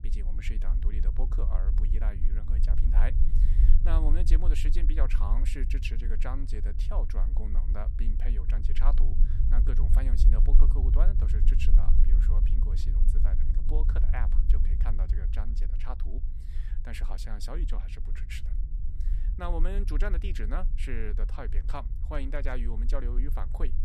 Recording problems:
low rumble; loud; throughout; 8 dB below the speech

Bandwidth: 14.5 kHz